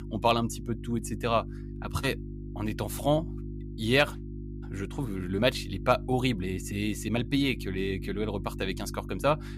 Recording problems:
electrical hum; noticeable; throughout; 50 Hz, 20 dB below the speech

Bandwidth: 15 kHz